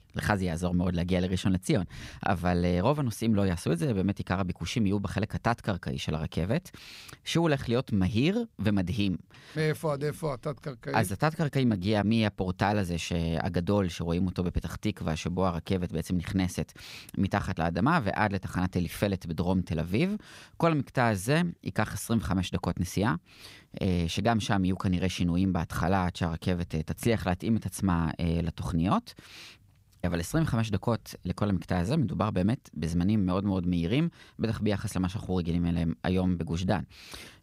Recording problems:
none

